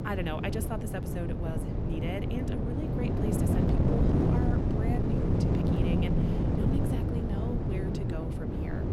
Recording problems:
wind noise on the microphone; heavy; 4 dB above the speech

